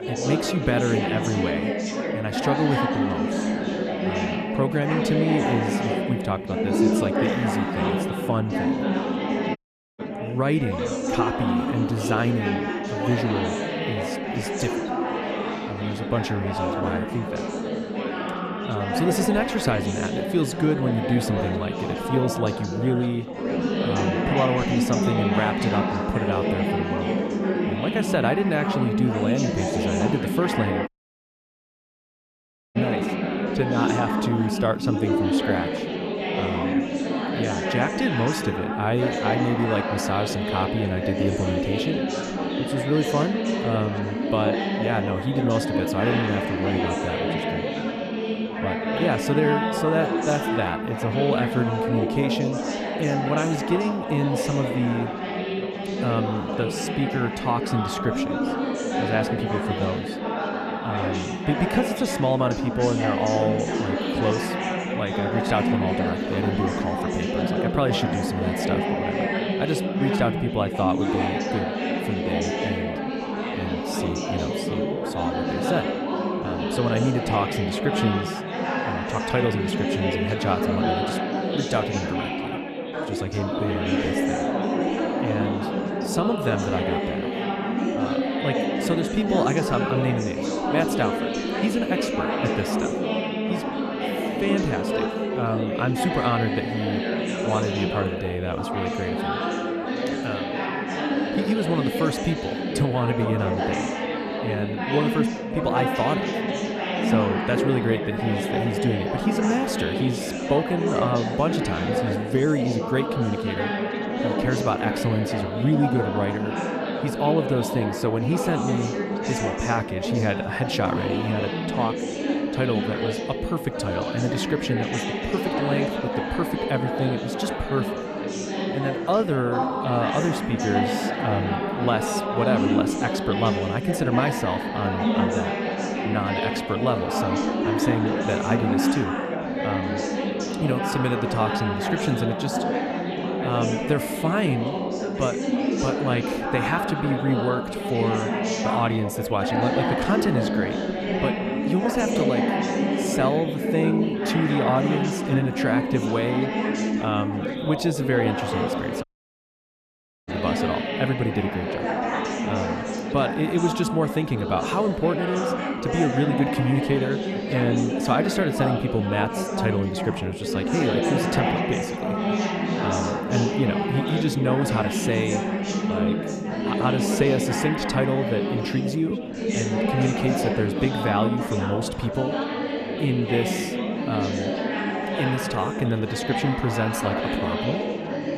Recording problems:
chatter from many people; very loud; throughout; 1 dB above the speech
audio cutting out; at 9.5 s, at 31 s for 2 s and at 2:39 for 1 s

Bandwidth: 14 kHz